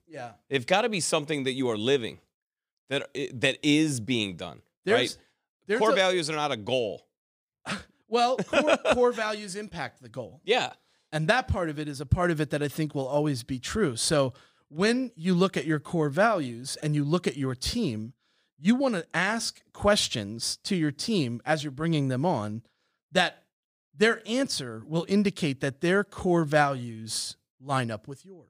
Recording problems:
none

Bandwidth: 15 kHz